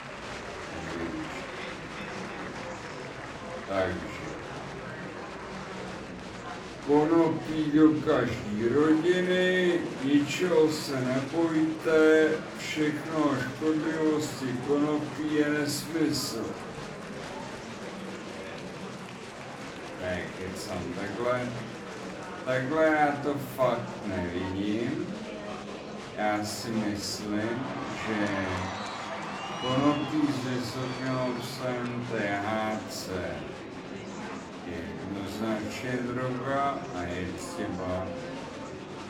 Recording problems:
off-mic speech; far
wrong speed, natural pitch; too slow; 0.5 times normal speed
room echo; slight; dies away in 0.4 s
murmuring crowd; loud; throughout; 10 dB below the speech

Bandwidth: 18.5 kHz